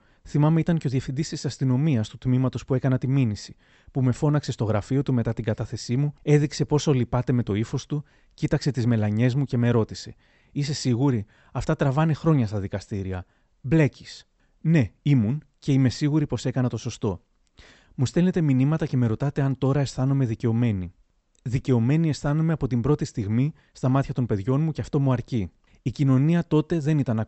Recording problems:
high frequencies cut off; noticeable; nothing above 8 kHz

